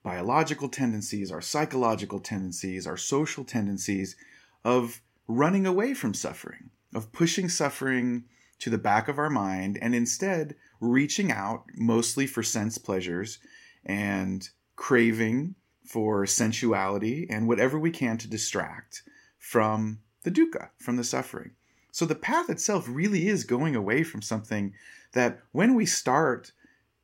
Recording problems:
none

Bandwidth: 16 kHz